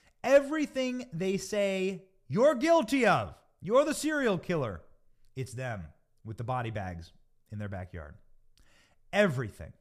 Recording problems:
none

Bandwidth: 14.5 kHz